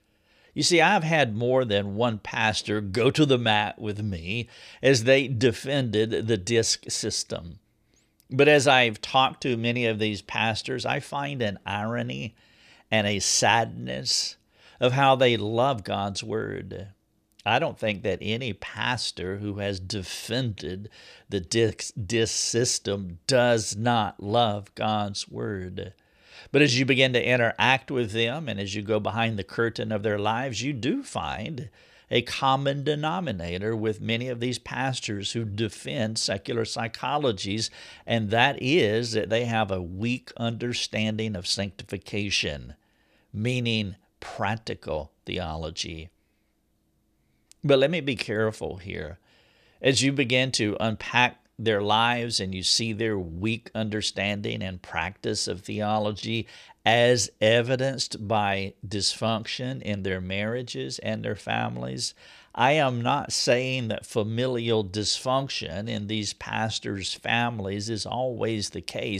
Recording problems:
abrupt cut into speech; at the end

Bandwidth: 14.5 kHz